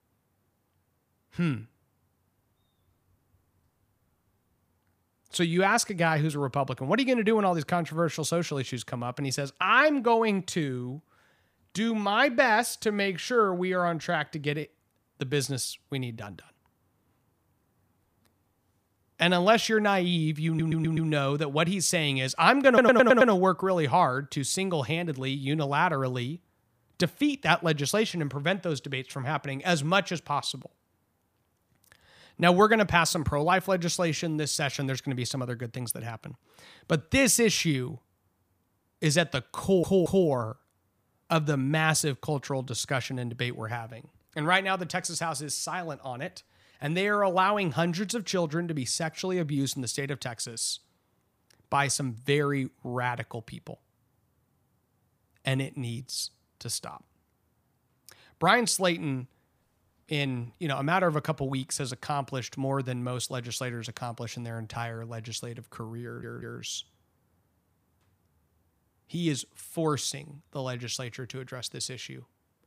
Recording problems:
audio stuttering; 4 times, first at 20 s

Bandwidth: 15 kHz